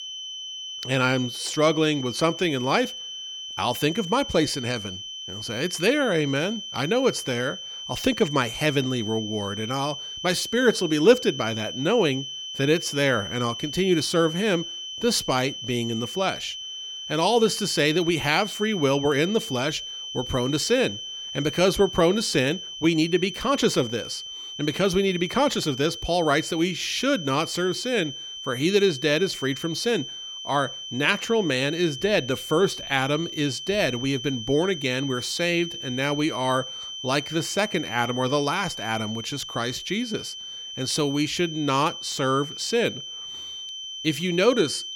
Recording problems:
high-pitched whine; loud; throughout; 3 kHz, 9 dB below the speech

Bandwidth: 17.5 kHz